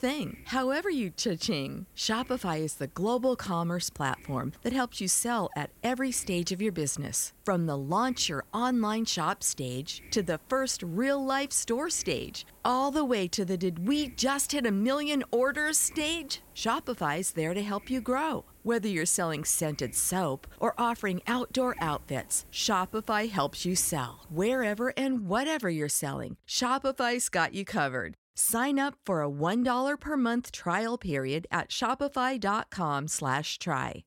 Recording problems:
hiss; faint; until 25 s; 25 dB below the speech

